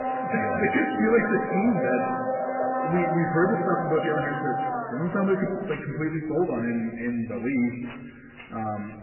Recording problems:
garbled, watery; badly; nothing above 2.5 kHz
room echo; noticeable; dies away in 1.5 s
distortion; slight; 10 dB below the speech
off-mic speech; somewhat distant
household noises; loud; throughout; 3 dB below the speech

